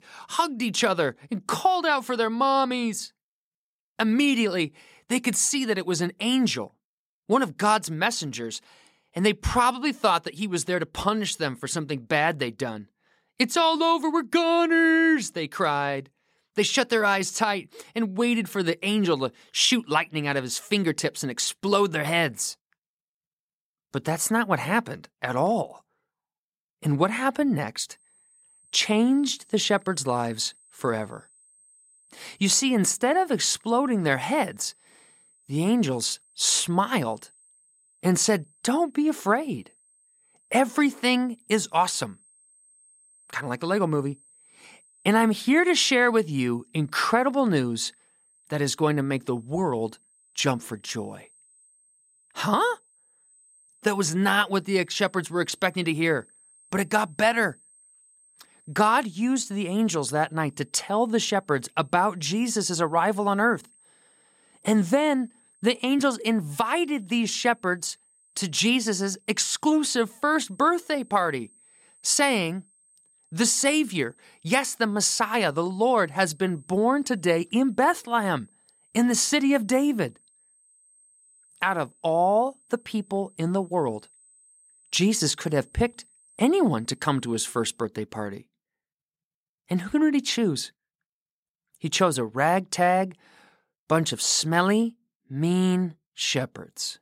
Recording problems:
high-pitched whine; faint; from 28 s to 1:28; 8.5 kHz, 30 dB below the speech

